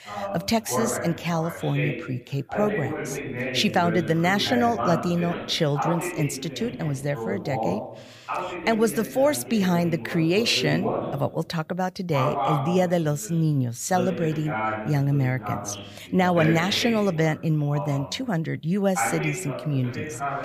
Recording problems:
voice in the background; loud; throughout; 6 dB below the speech

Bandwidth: 15 kHz